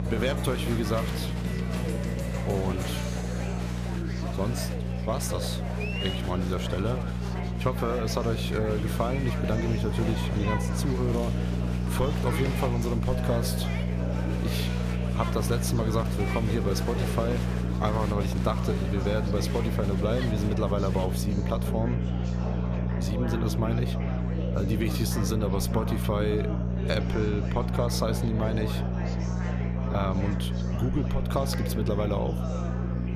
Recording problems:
electrical hum; loud; throughout; 60 Hz, 7 dB below the speech
chatter from many people; loud; throughout; 6 dB below the speech

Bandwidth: 14.5 kHz